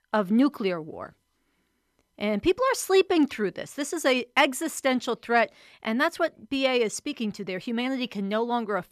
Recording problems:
none

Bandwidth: 14.5 kHz